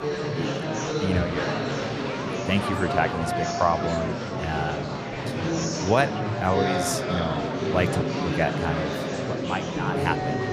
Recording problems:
murmuring crowd; very loud; throughout; 1 dB above the speech

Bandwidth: 15 kHz